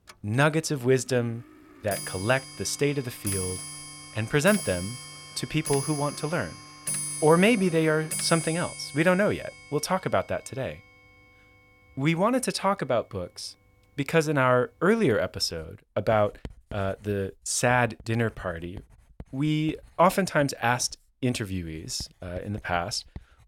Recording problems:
household noises; loud; throughout; 9 dB below the speech

